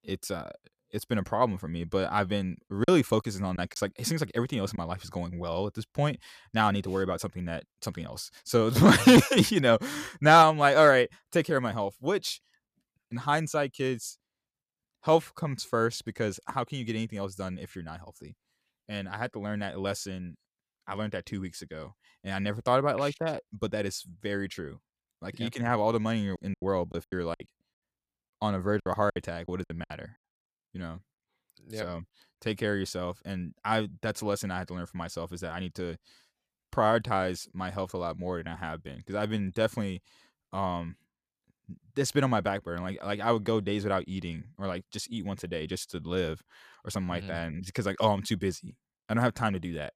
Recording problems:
choppy; very; from 3 to 5 s and from 26 to 30 s; 12% of the speech affected

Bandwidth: 14.5 kHz